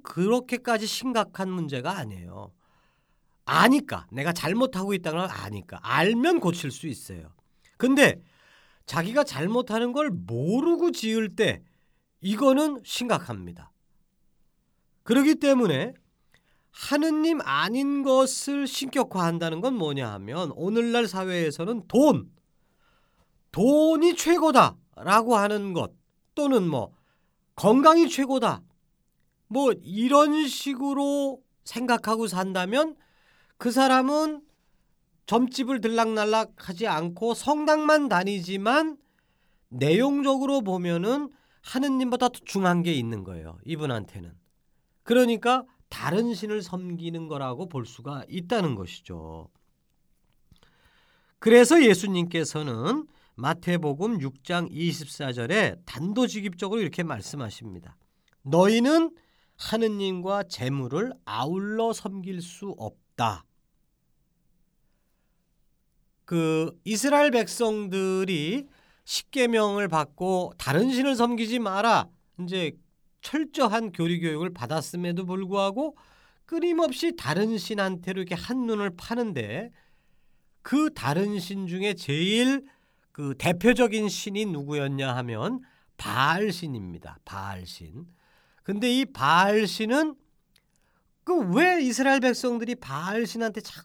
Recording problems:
none

